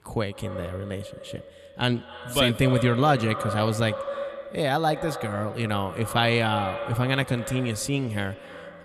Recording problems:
echo of what is said; strong; throughout; 120 ms later, 10 dB below the speech

